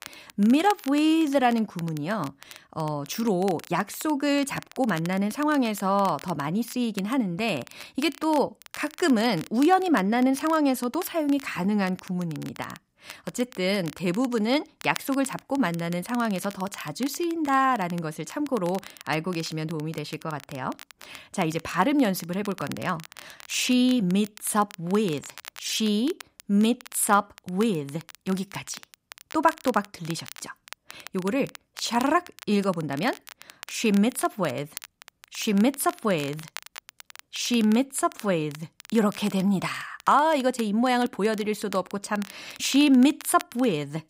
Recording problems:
crackle, like an old record; noticeable; 20 dB below the speech

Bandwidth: 15.5 kHz